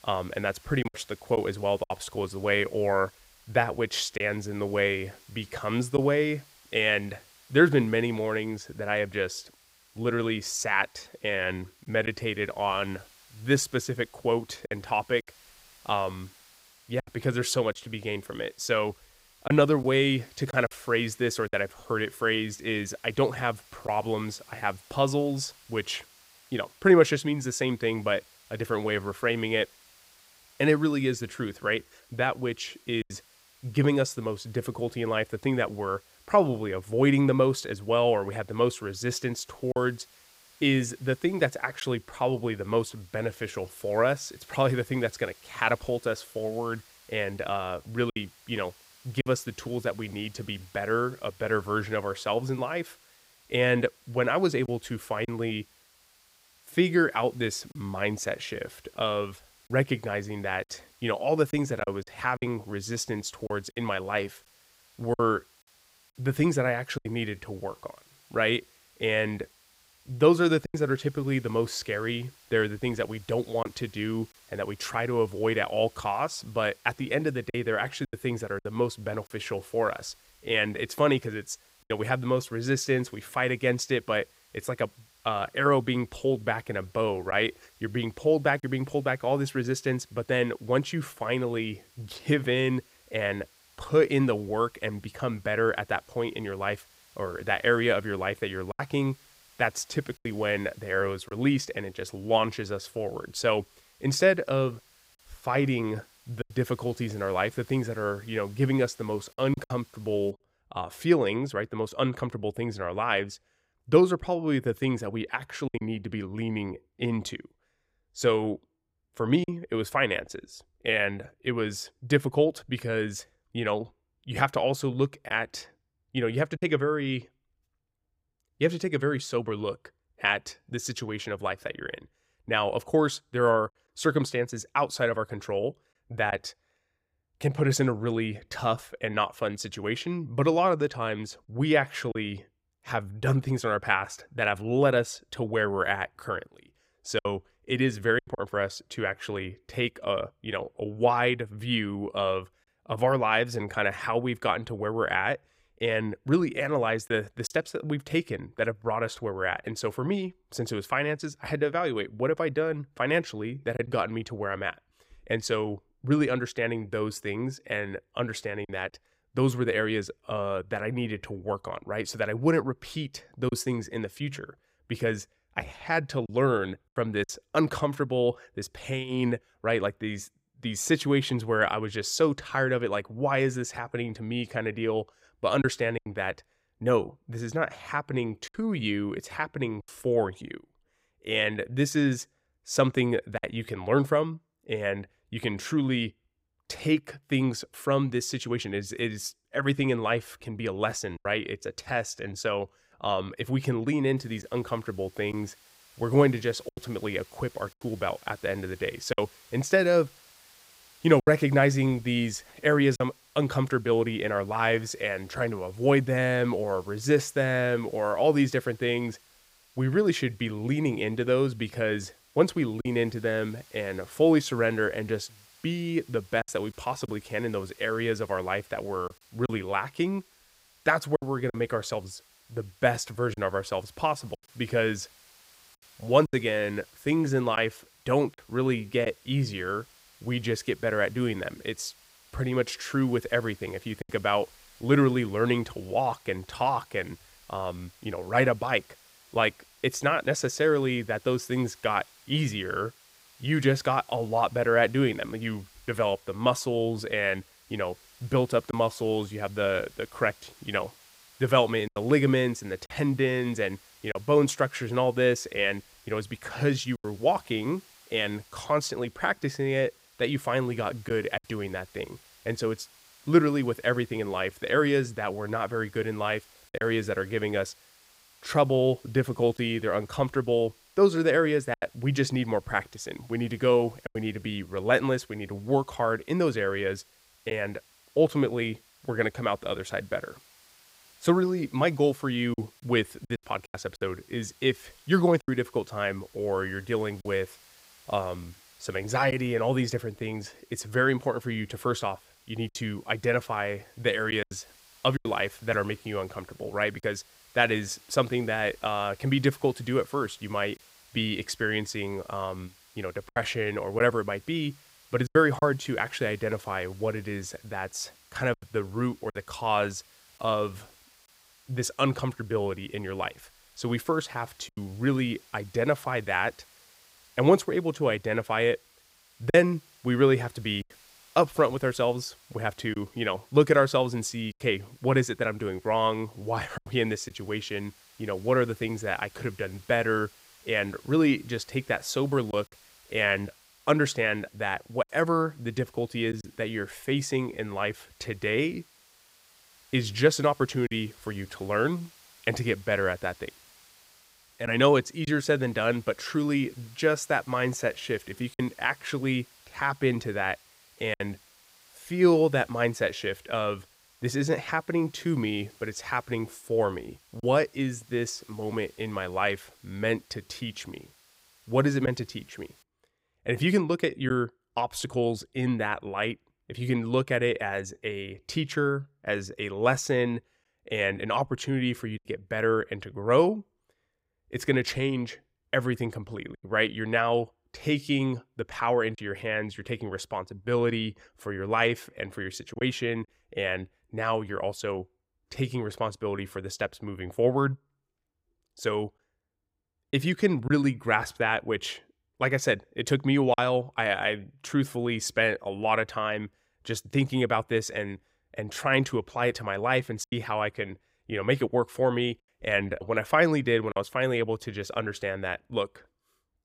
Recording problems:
hiss; faint; until 1:50 and from 3:24 to 6:13; 25 dB below the speech
choppy; occasionally; 2% of the speech affected

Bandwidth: 15.5 kHz